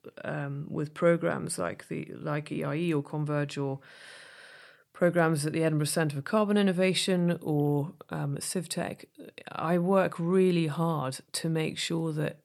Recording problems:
none

